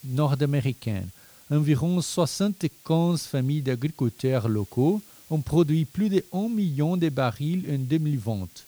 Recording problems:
hiss; faint; throughout; 25 dB below the speech

